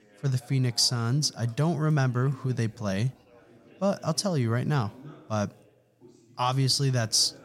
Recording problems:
background chatter; faint; throughout; 3 voices, 25 dB below the speech

